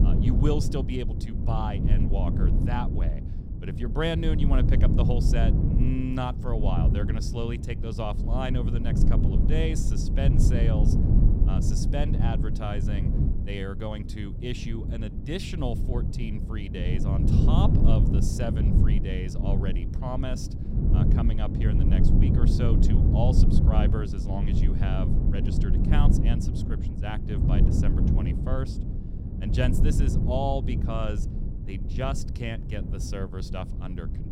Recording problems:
wind noise on the microphone; heavy; 2 dB below the speech

